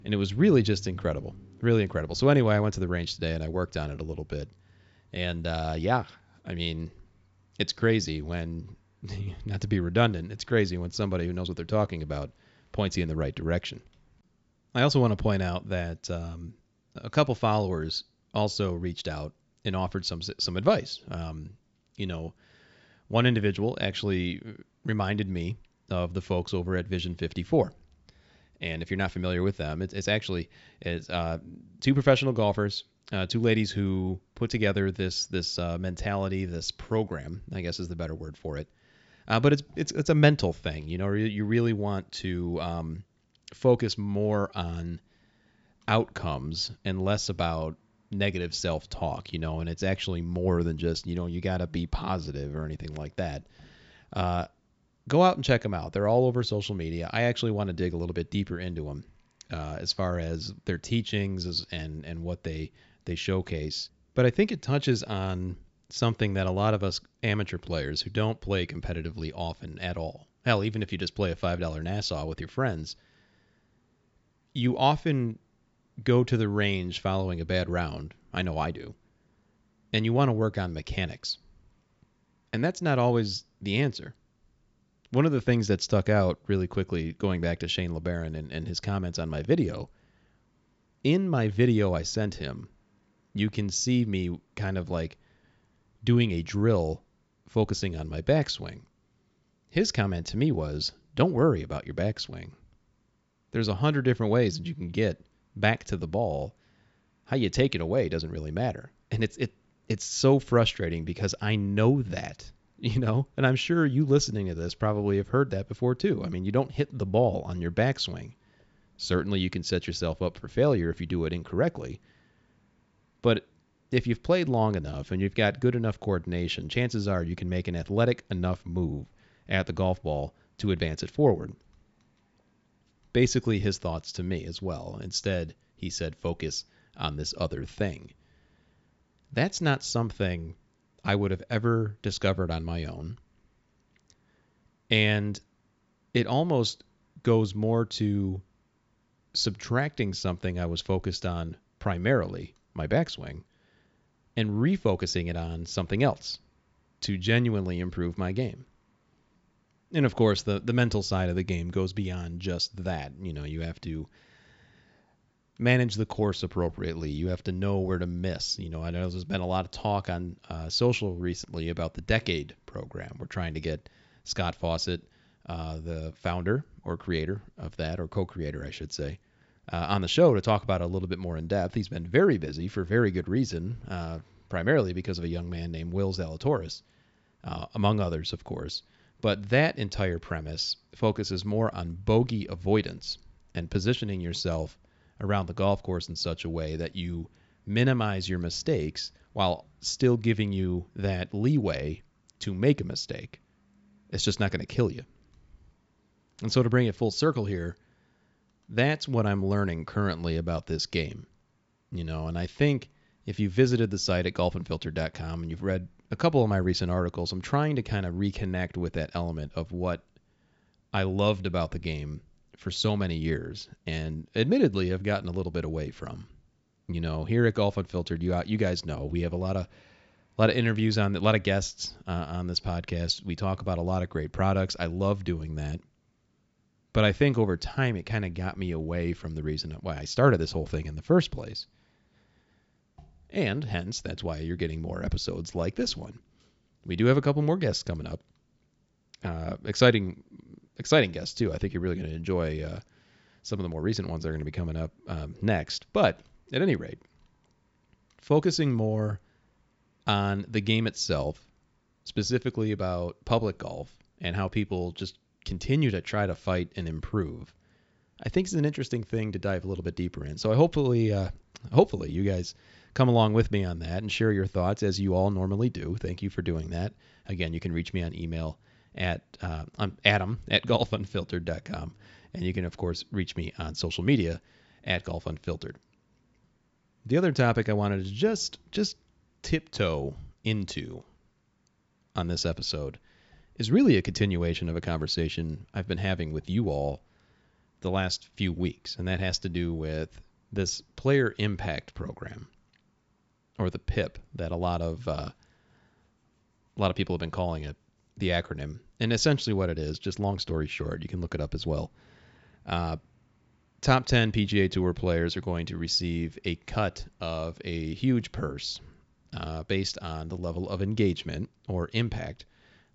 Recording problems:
high frequencies cut off; noticeable; nothing above 8 kHz

